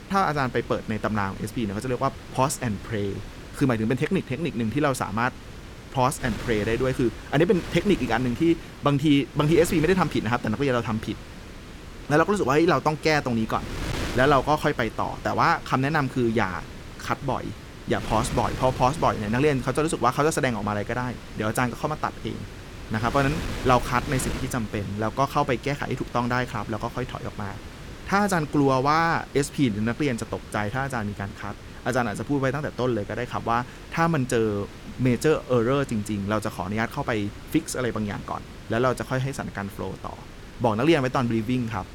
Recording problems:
wind noise on the microphone; occasional gusts; 15 dB below the speech

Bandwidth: 17.5 kHz